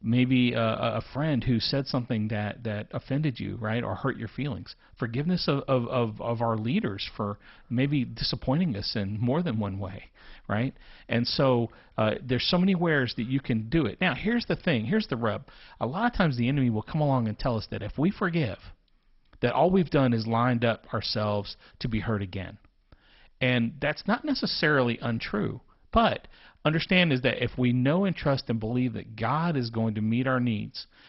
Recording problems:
garbled, watery; badly; nothing above 5.5 kHz

